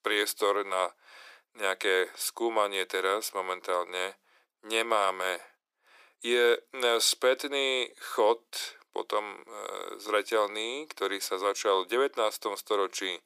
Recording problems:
thin; very; fading below 400 Hz

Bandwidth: 15 kHz